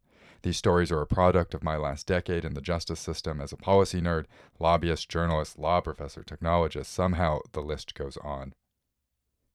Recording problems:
none

